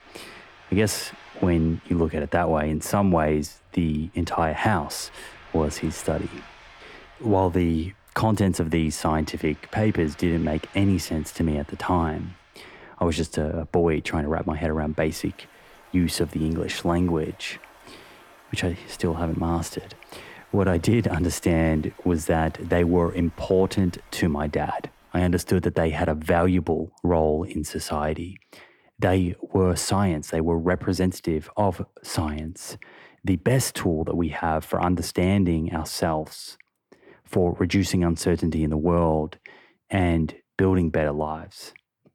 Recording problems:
rain or running water; faint; until 25 s; 25 dB below the speech

